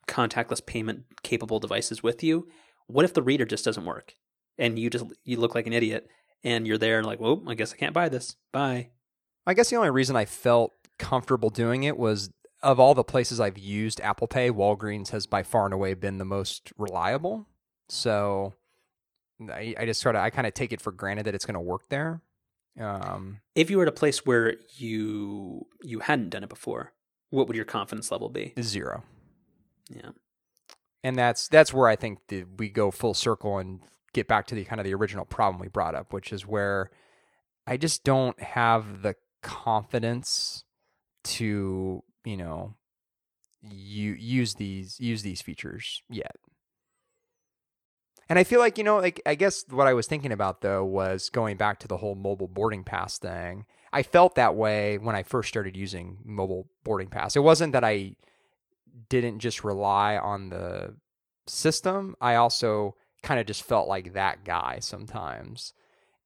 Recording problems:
none

